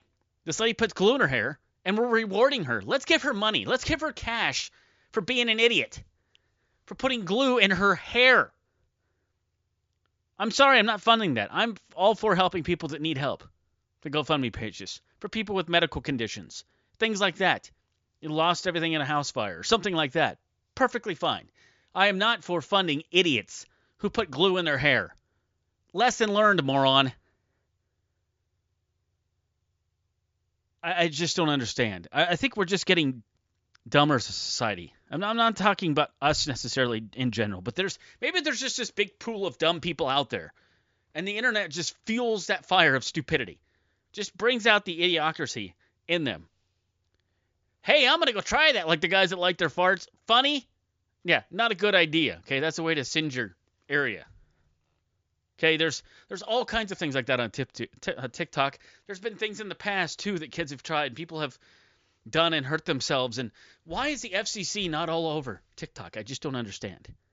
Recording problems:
high frequencies cut off; noticeable; nothing above 7.5 kHz

